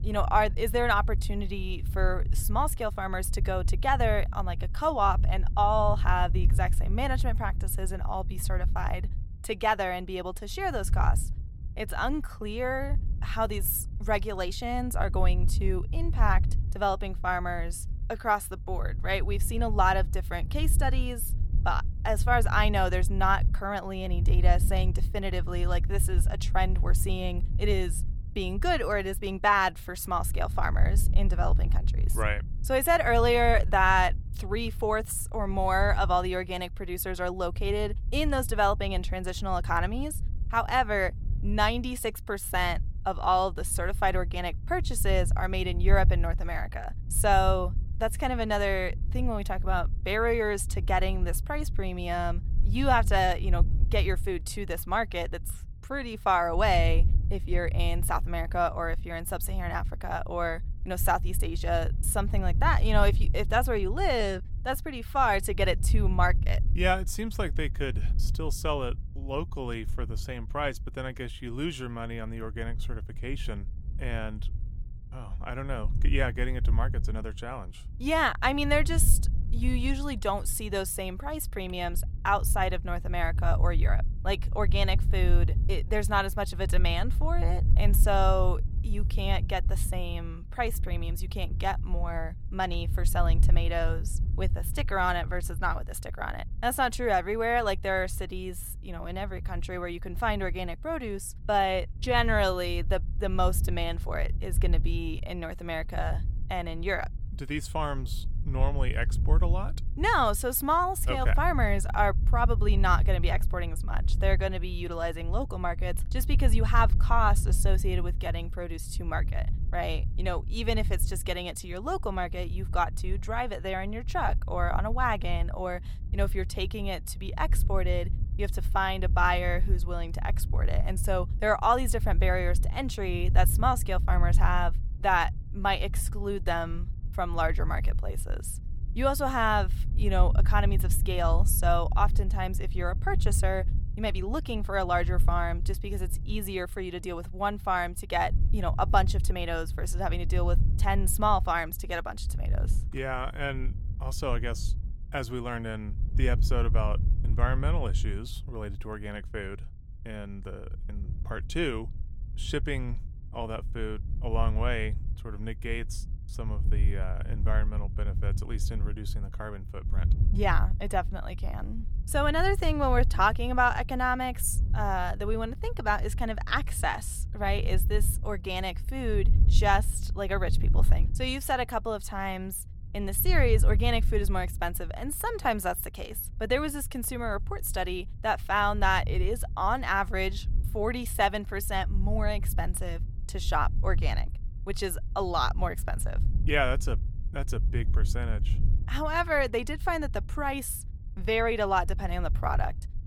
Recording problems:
wind noise on the microphone; occasional gusts; 20 dB below the speech

